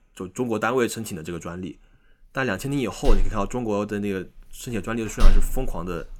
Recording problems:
household noises; loud; throughout; 1 dB below the speech

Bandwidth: 17.5 kHz